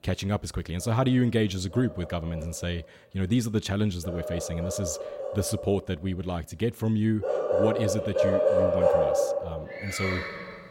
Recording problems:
animal sounds; very loud; throughout; 1 dB above the speech

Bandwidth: 16 kHz